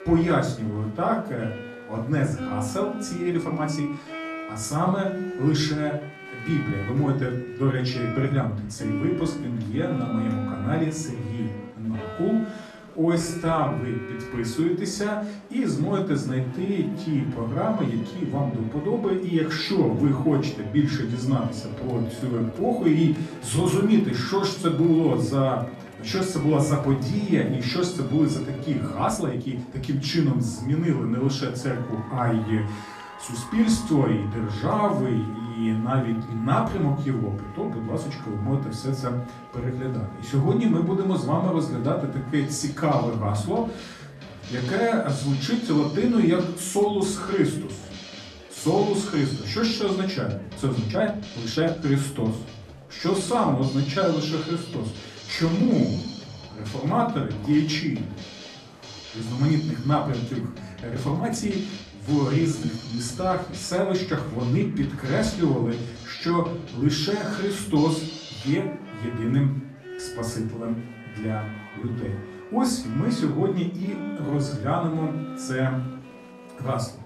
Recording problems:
off-mic speech; far
room echo; slight; dies away in 0.4 s
background music; noticeable; throughout; 15 dB below the speech
murmuring crowd; faint; throughout; 25 dB below the speech
uneven, jittery; strongly; from 3.5 s to 1:15

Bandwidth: 13.5 kHz